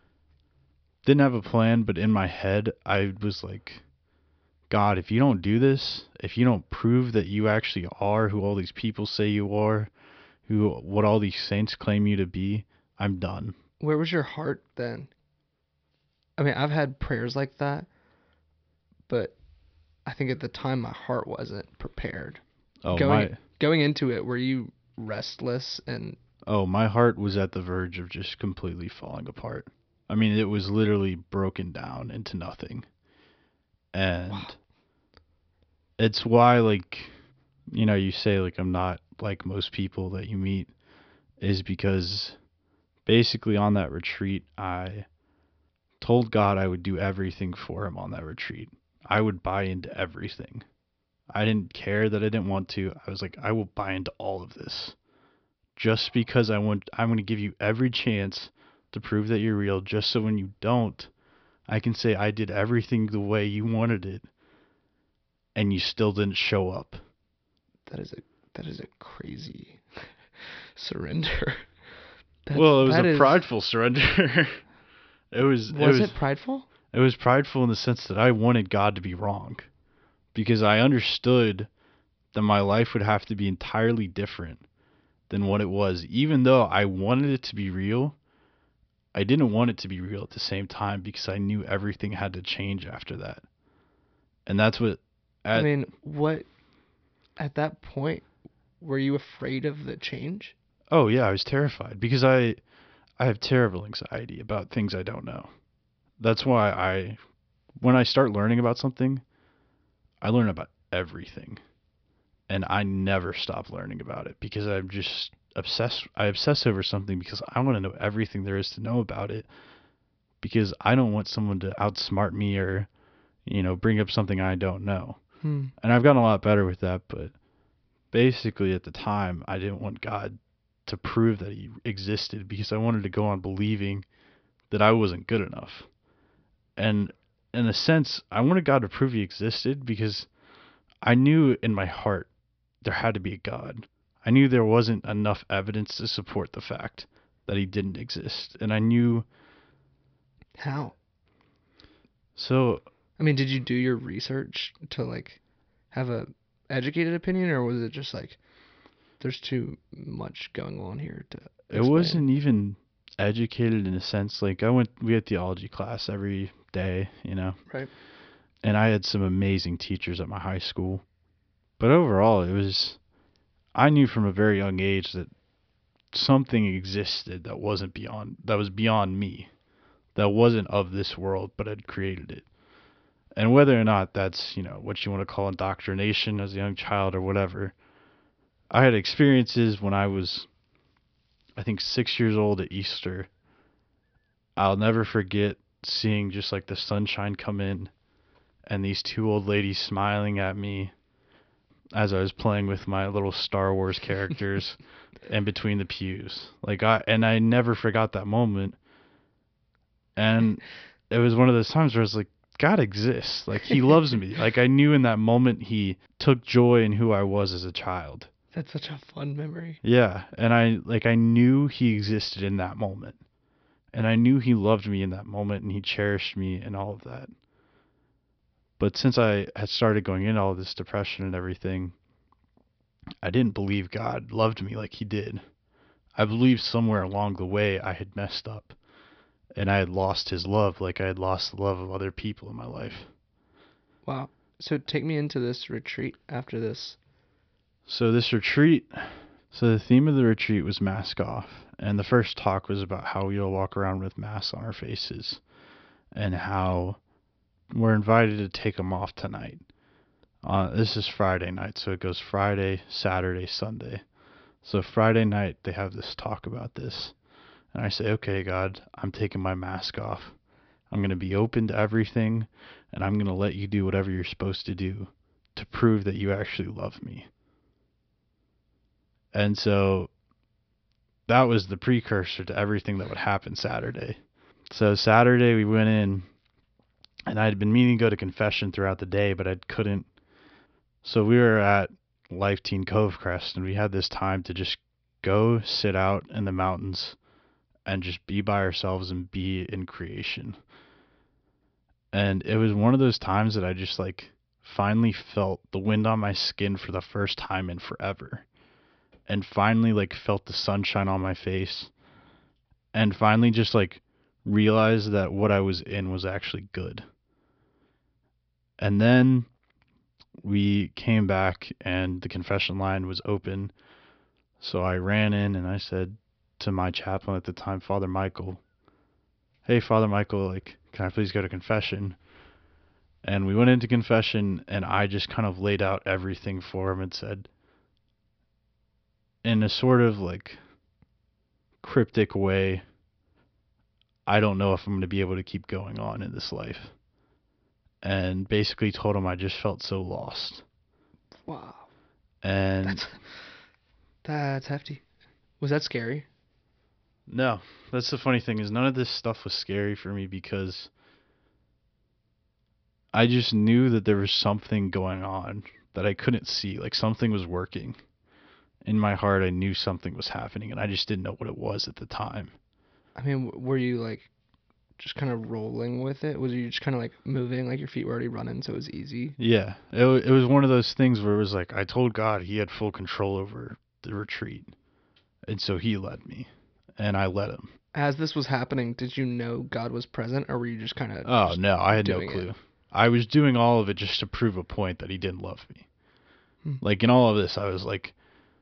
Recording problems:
high frequencies cut off; noticeable; nothing above 5.5 kHz

